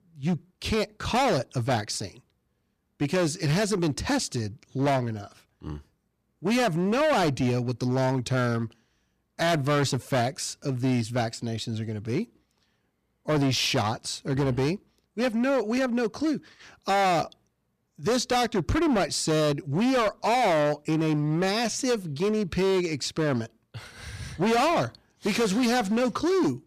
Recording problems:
distortion; heavy; 15% of the sound clipped

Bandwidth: 14.5 kHz